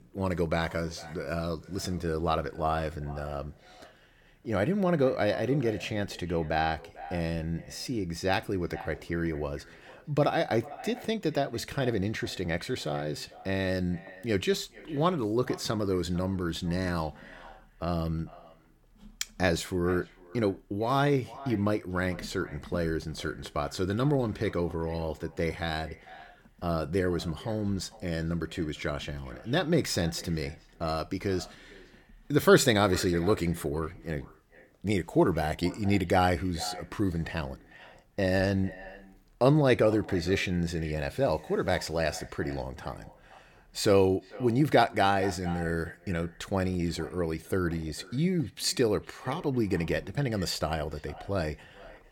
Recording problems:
echo of what is said; faint; throughout; 450 ms later, 20 dB below the speech

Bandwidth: 18 kHz